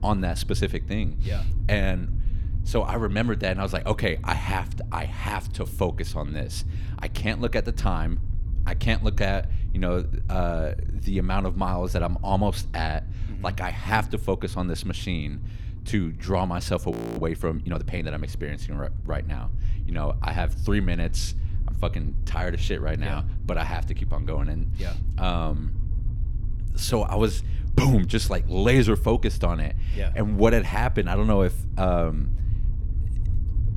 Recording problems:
low rumble; noticeable; throughout; 20 dB below the speech
audio freezing; at 17 s

